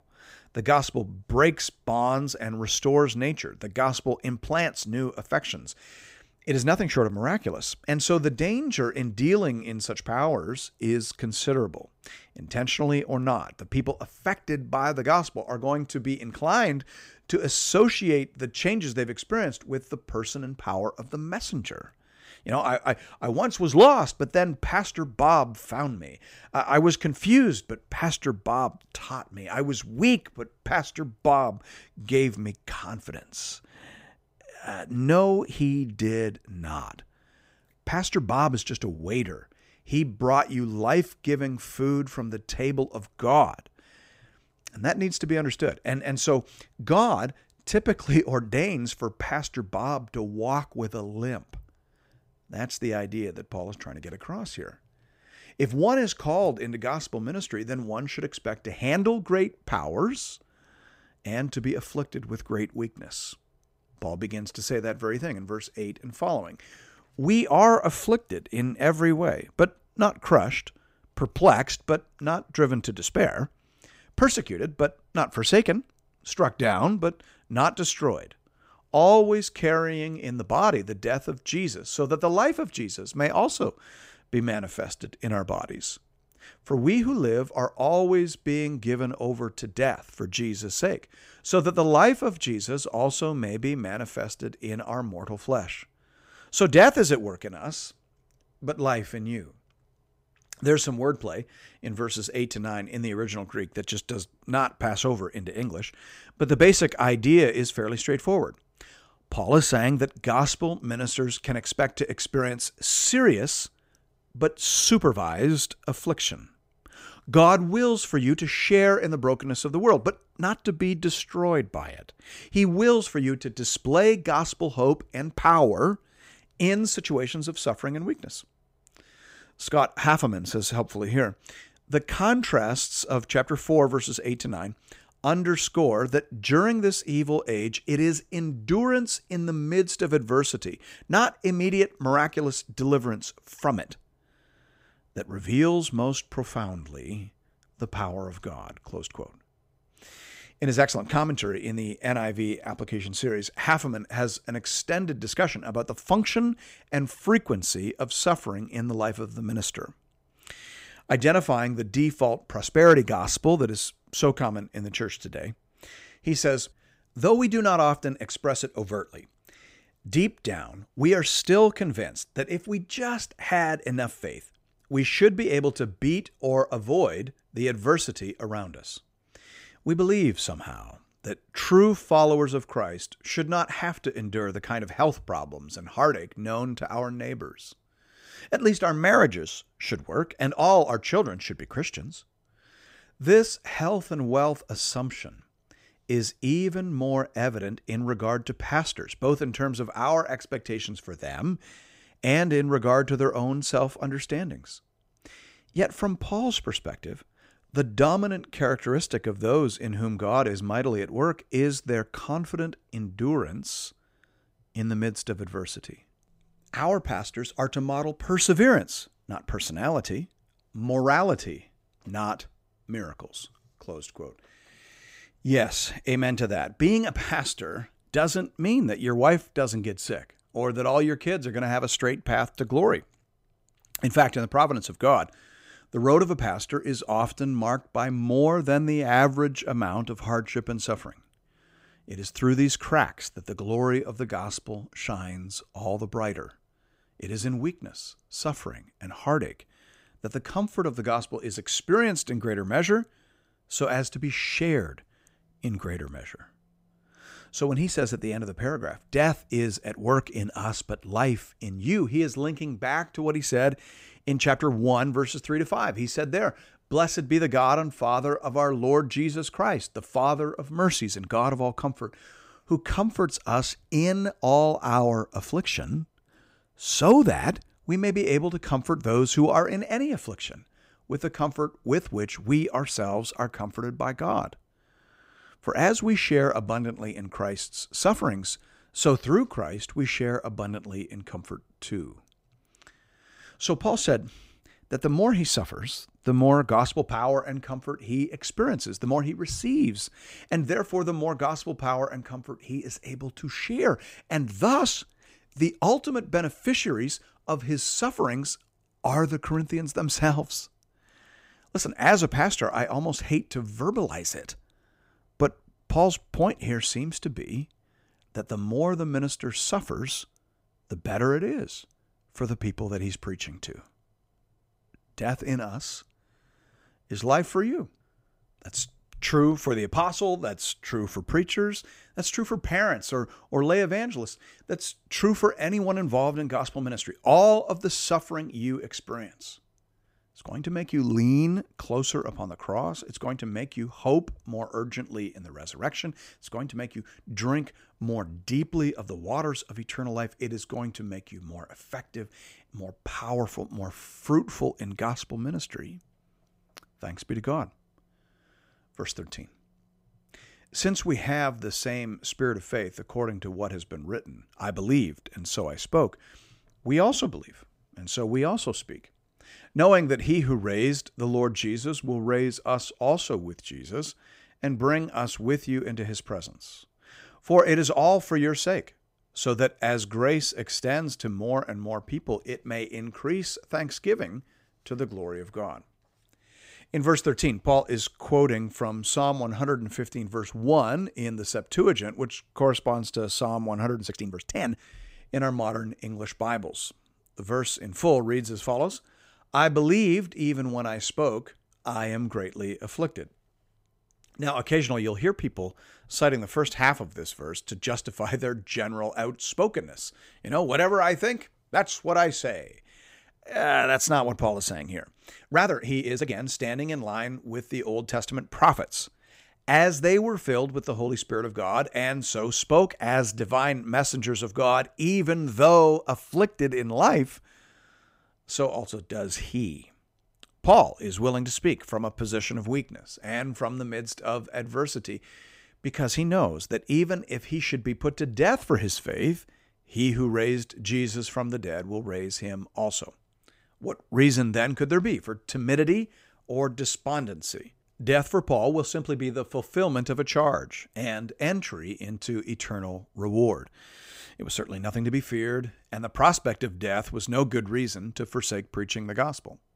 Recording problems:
uneven, jittery; strongly; from 3:14 to 6:56

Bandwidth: 15.5 kHz